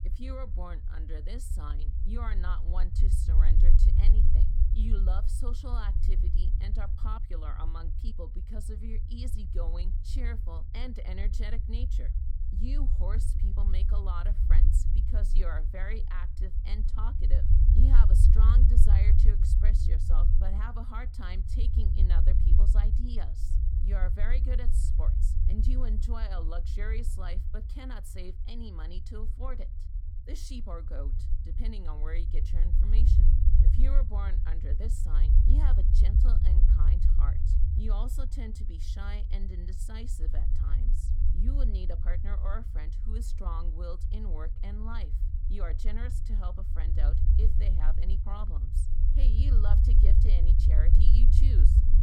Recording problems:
low rumble; loud; throughout; 3 dB below the speech

